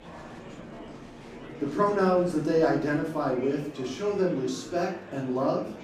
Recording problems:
off-mic speech; far
room echo; noticeable; dies away in 0.5 s
murmuring crowd; noticeable; throughout; 15 dB below the speech
background music; faint; throughout; 25 dB below the speech

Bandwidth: 15.5 kHz